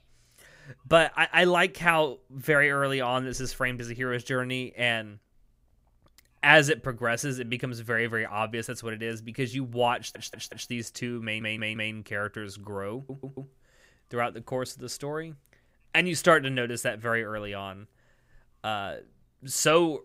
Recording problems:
audio stuttering; at 10 s, at 11 s and at 13 s

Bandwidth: 15.5 kHz